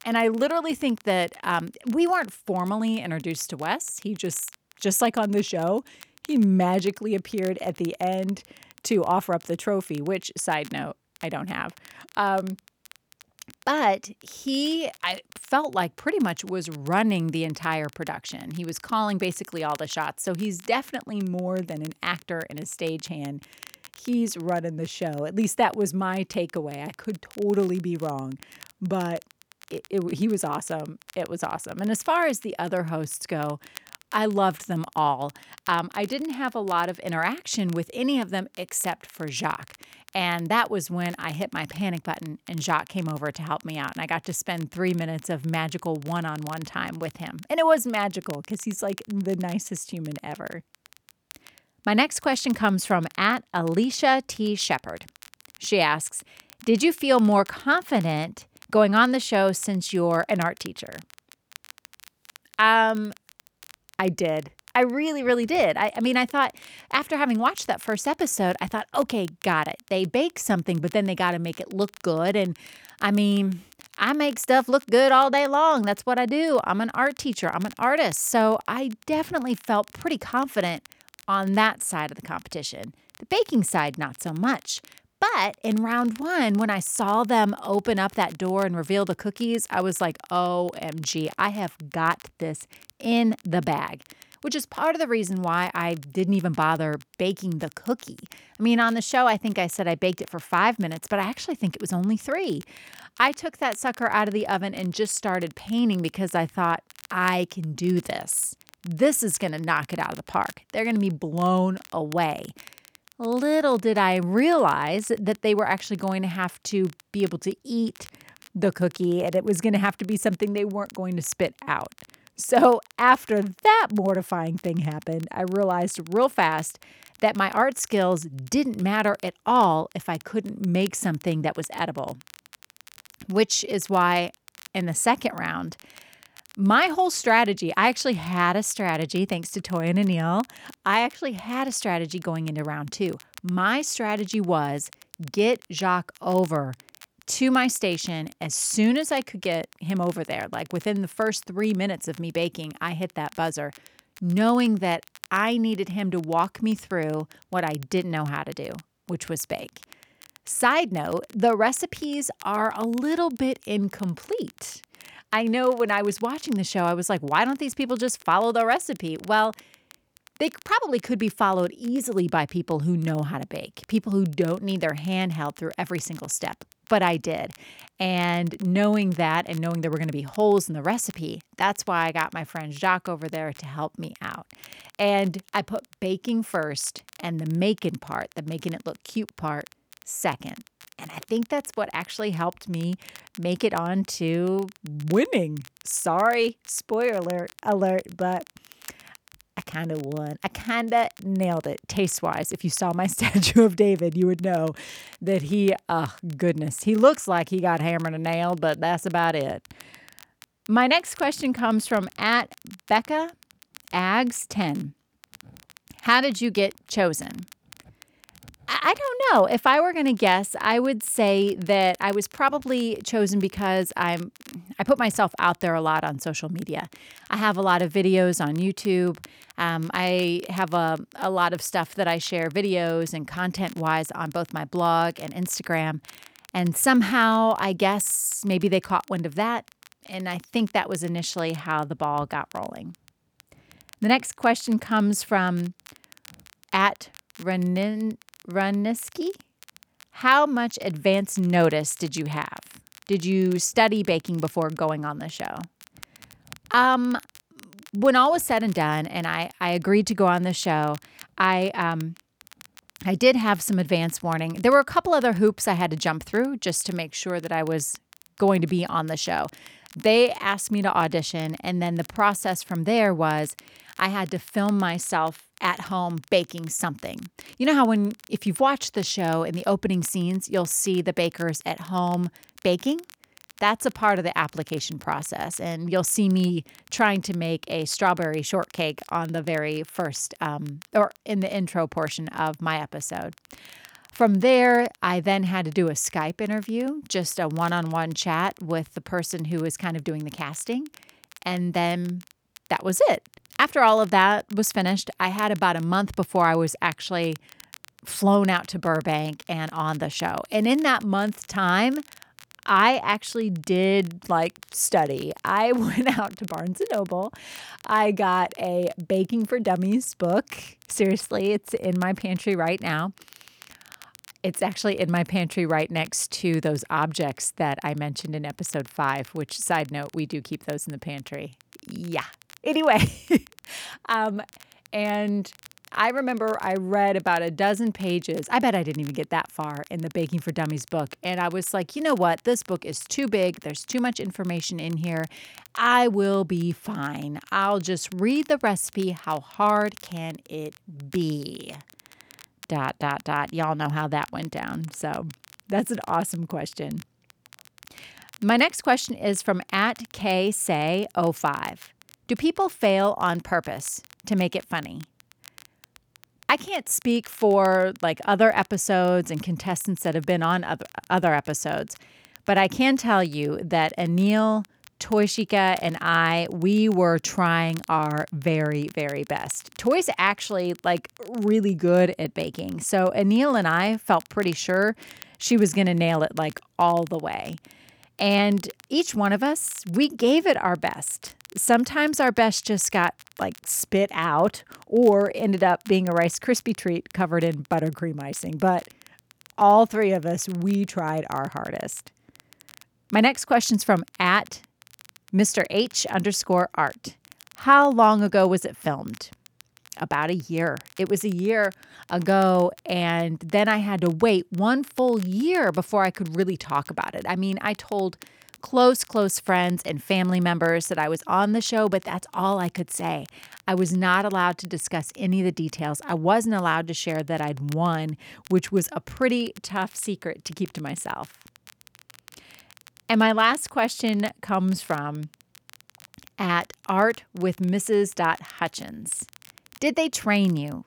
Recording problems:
crackle, like an old record; faint; 25 dB below the speech

